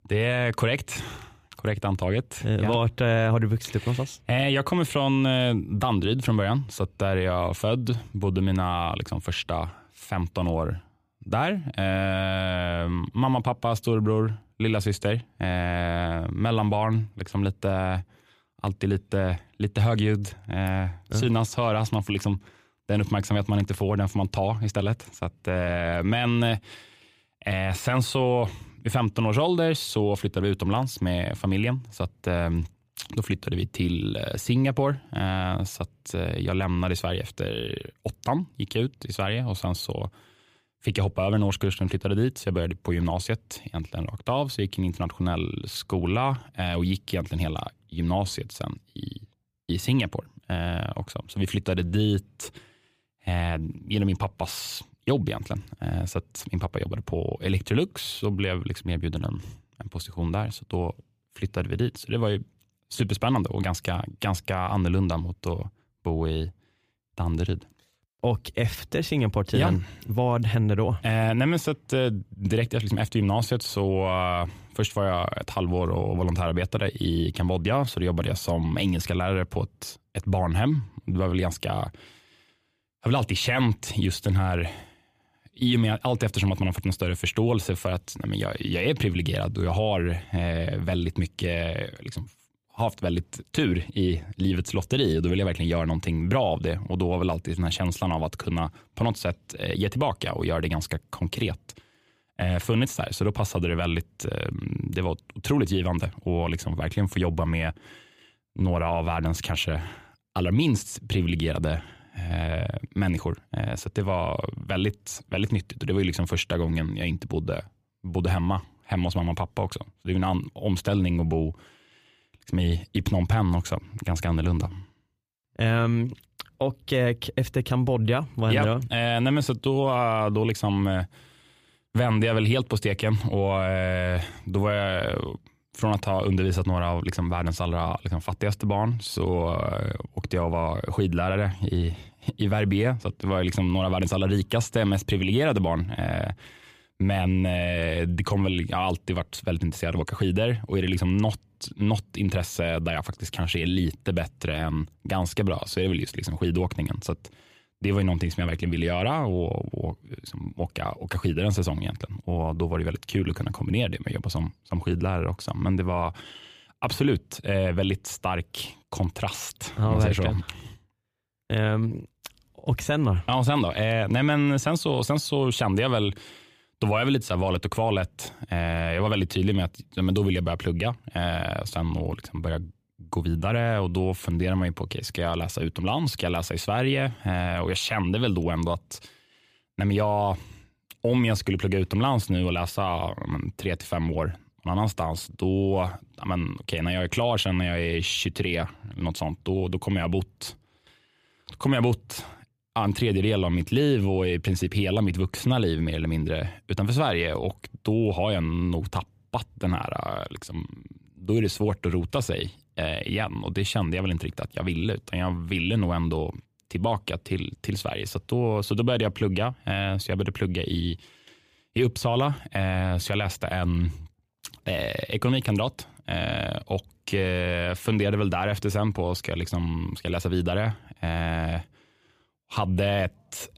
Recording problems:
none

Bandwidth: 15 kHz